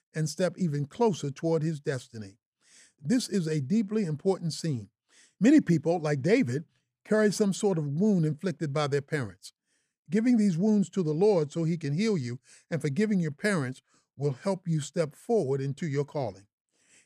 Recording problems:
none

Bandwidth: 14.5 kHz